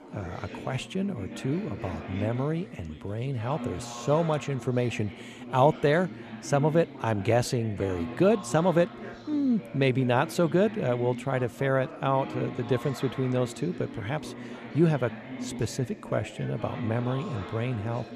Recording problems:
background chatter; noticeable; throughout; 4 voices, 10 dB below the speech

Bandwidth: 13.5 kHz